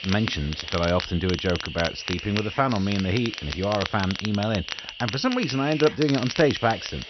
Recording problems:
high frequencies cut off; noticeable; nothing above 6 kHz
crackle, like an old record; loud; 9 dB below the speech
hiss; noticeable; throughout; 10 dB below the speech

